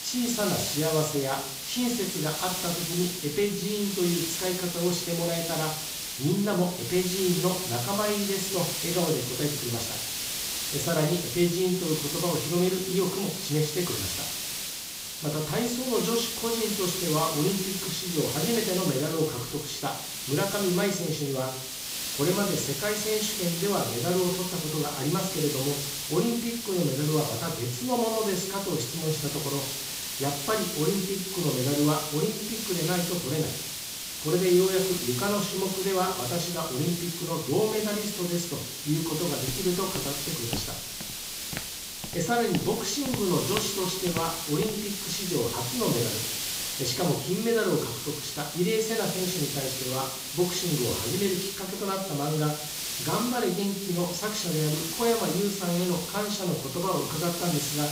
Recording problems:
off-mic speech; far
high frequencies cut off; noticeable; nothing above 8 kHz
room echo; slight; dies away in 0.4 s
hiss; loud; throughout; 2 dB below the speech
footsteps; noticeable; from 39 to 45 s; peak 7 dB below the speech

